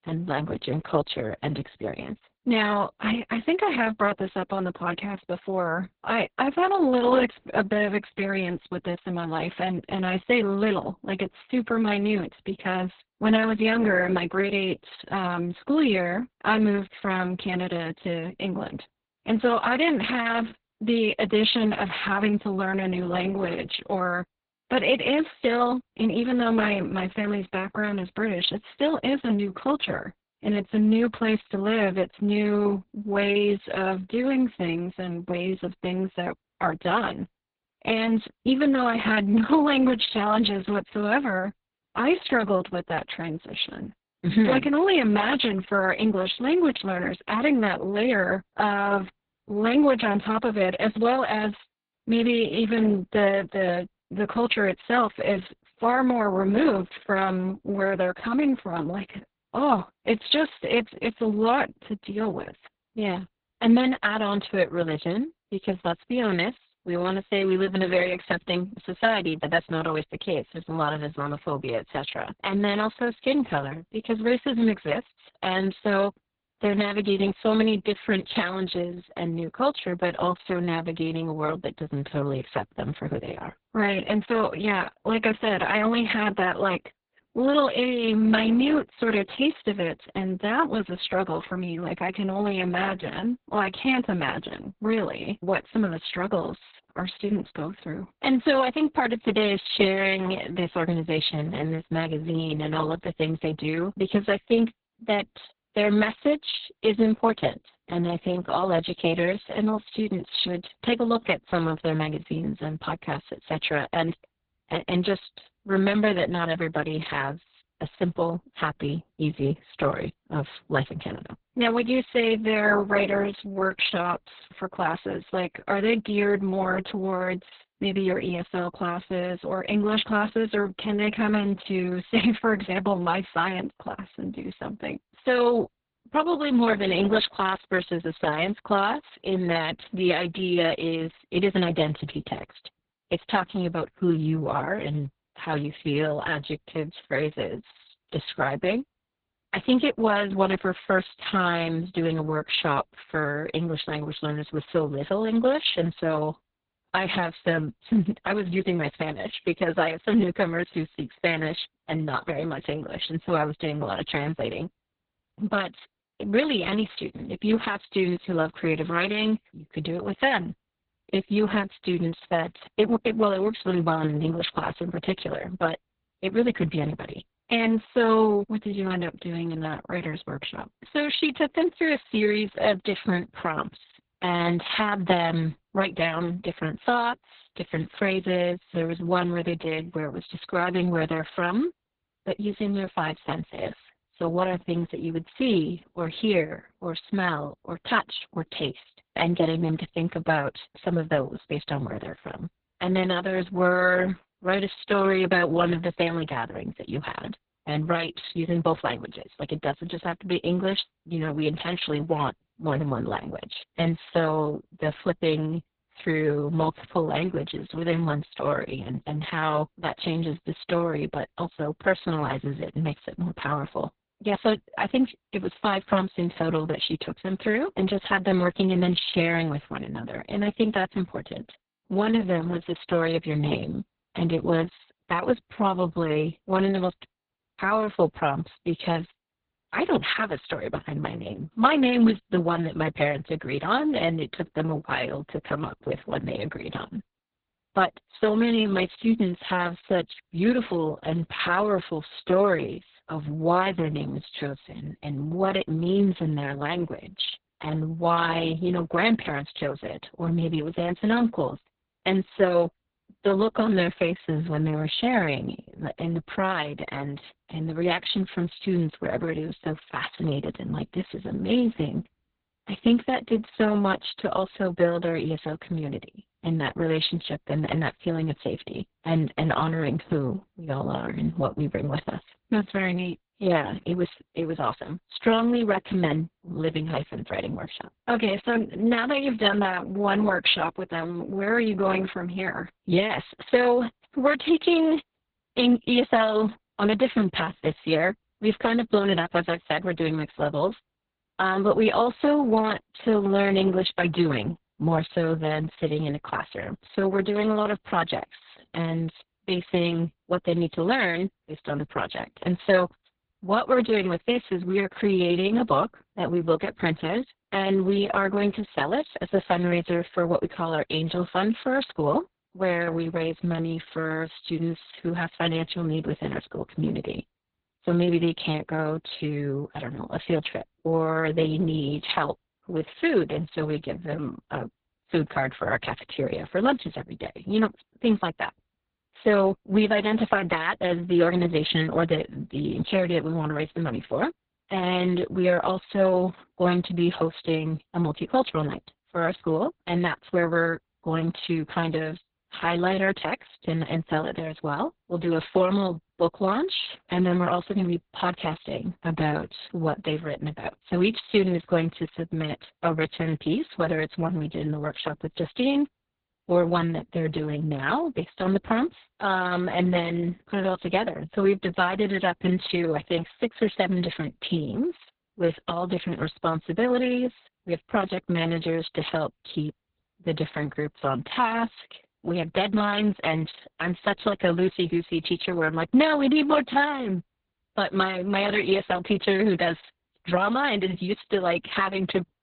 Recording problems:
garbled, watery; badly; nothing above 4 kHz

